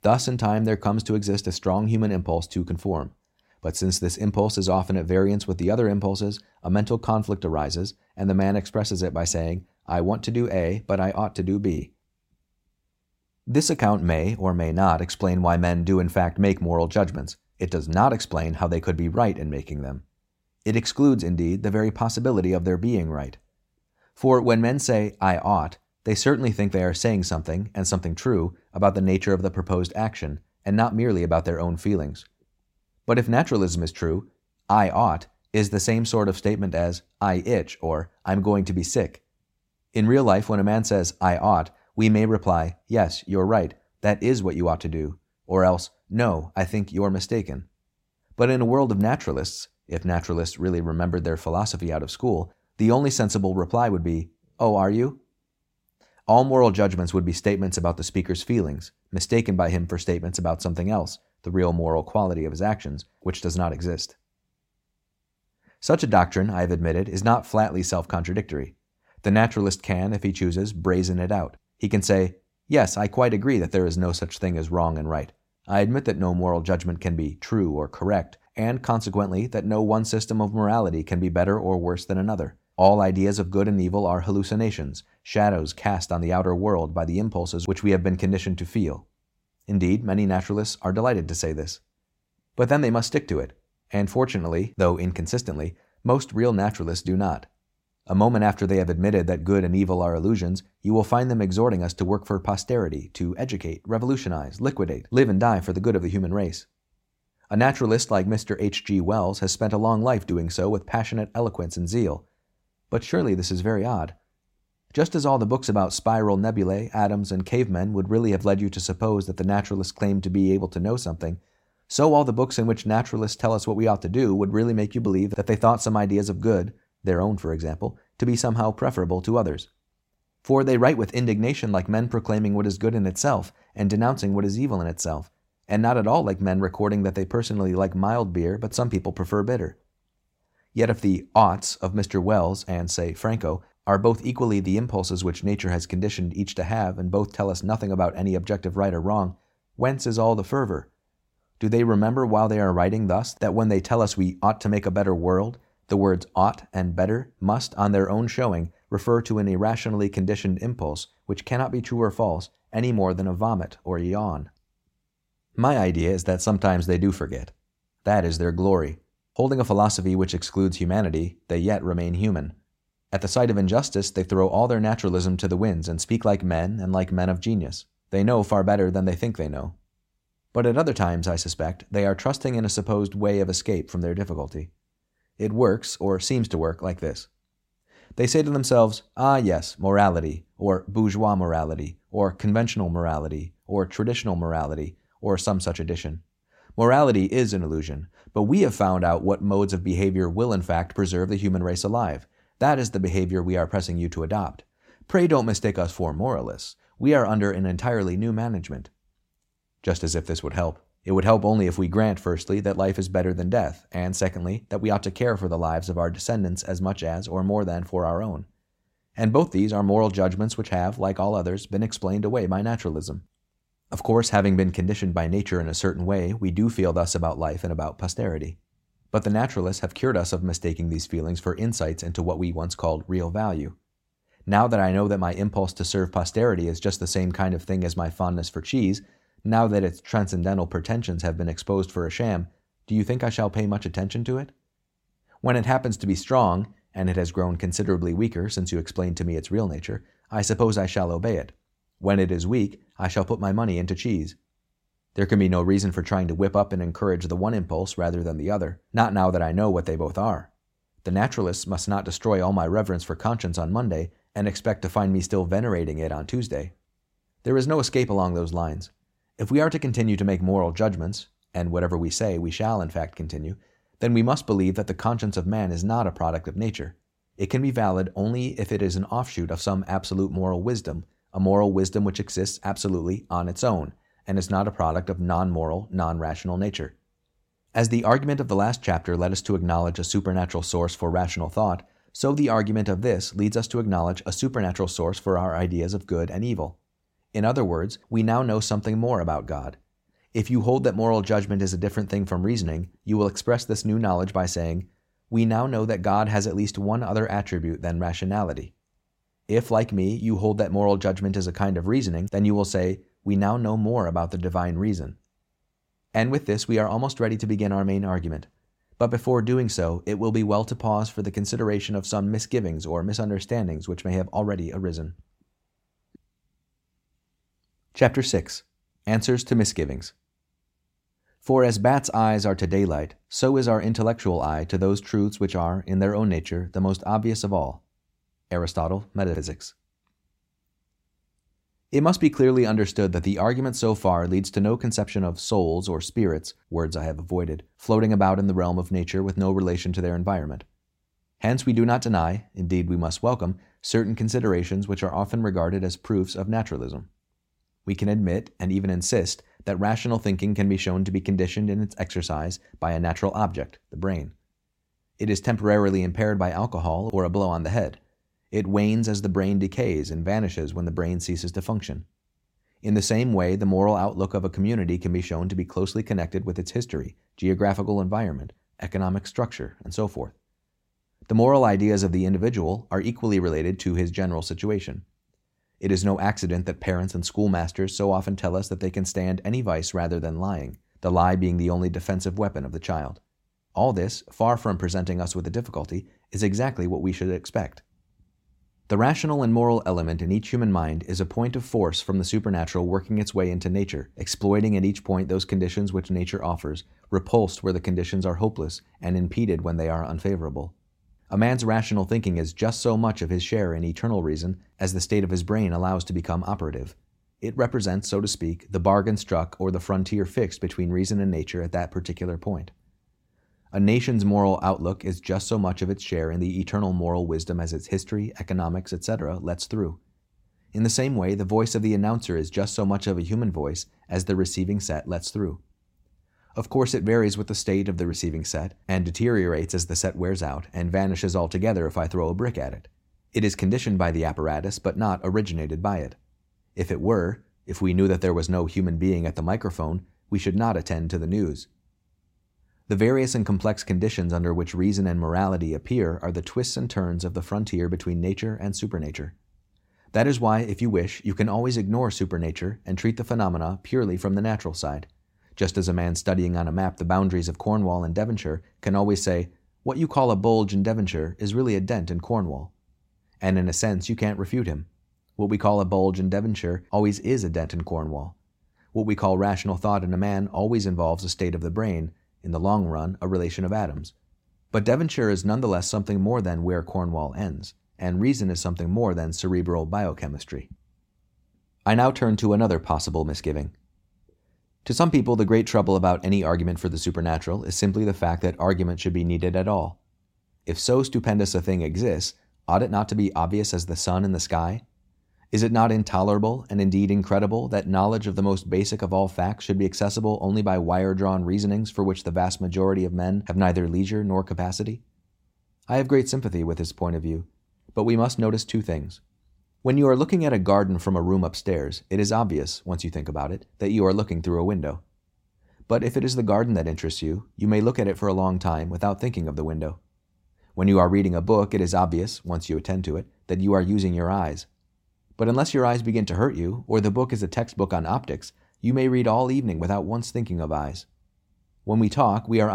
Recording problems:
abrupt cut into speech; at the end

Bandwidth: 16 kHz